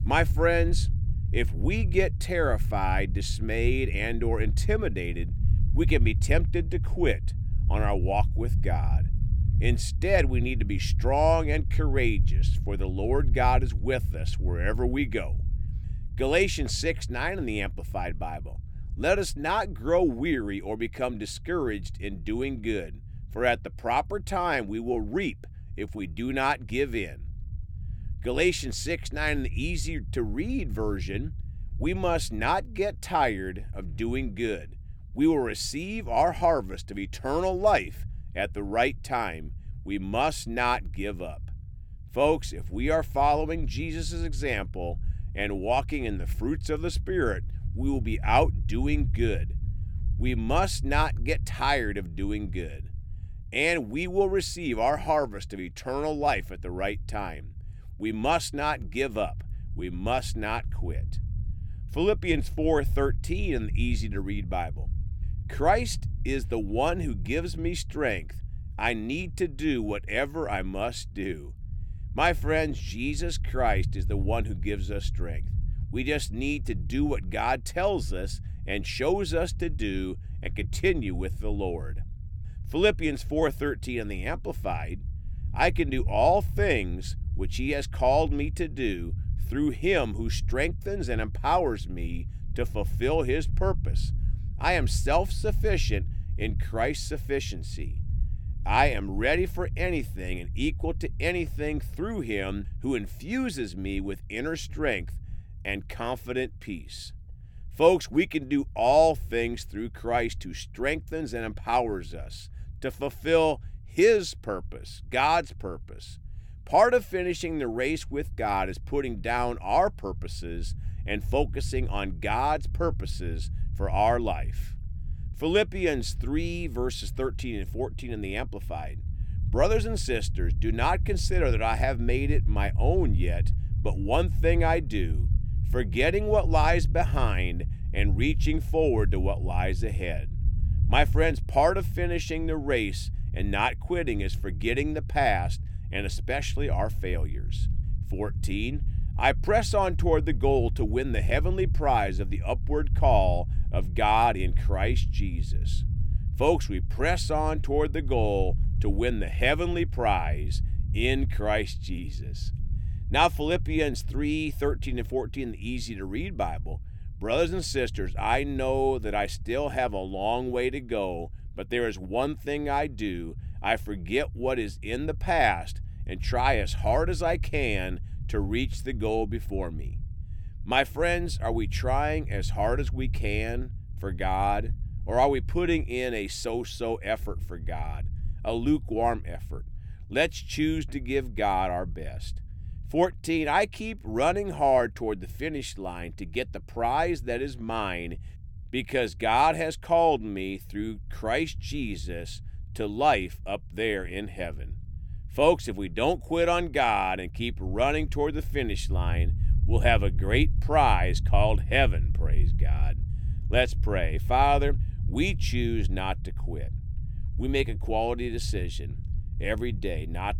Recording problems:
low rumble; faint; throughout; 20 dB below the speech

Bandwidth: 18 kHz